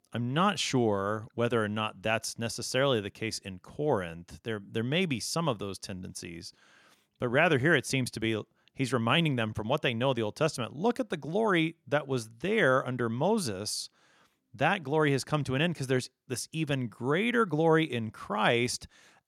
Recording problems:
none

